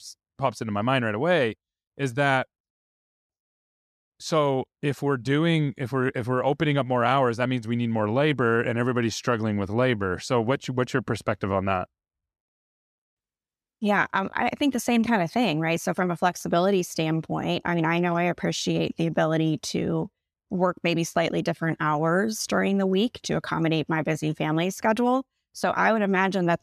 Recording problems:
none

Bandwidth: 14 kHz